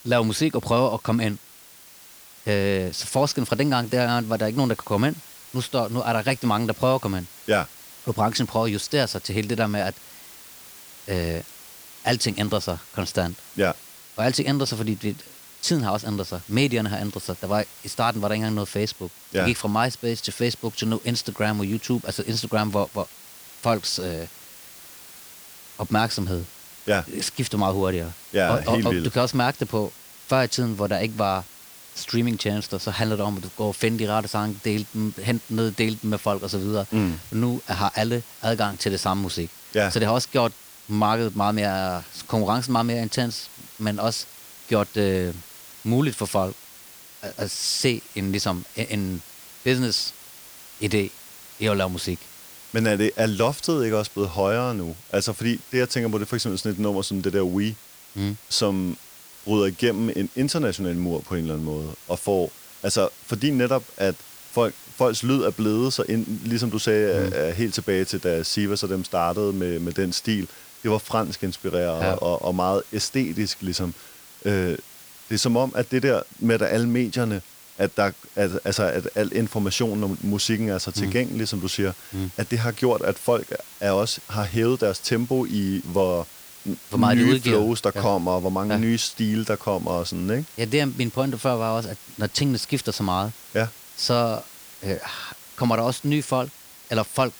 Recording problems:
hiss; noticeable; throughout; 15 dB below the speech

